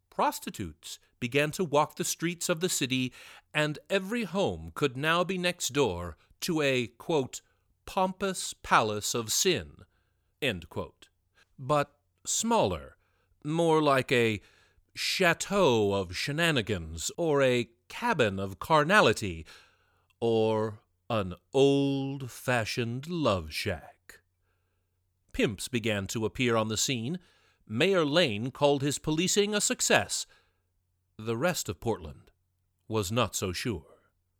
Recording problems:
none

